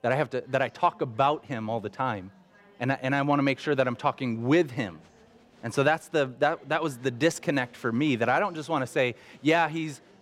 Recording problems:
chatter from many people; faint; throughout; 30 dB below the speech

